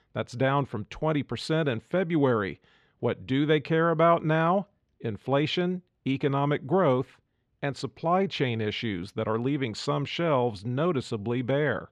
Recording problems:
muffled; very slightly; fading above 3 kHz

